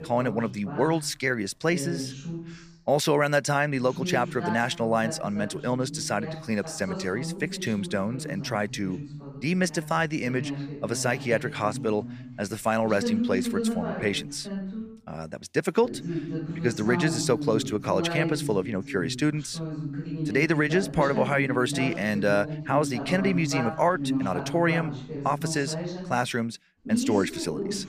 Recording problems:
voice in the background; loud; throughout; 7 dB below the speech

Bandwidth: 15 kHz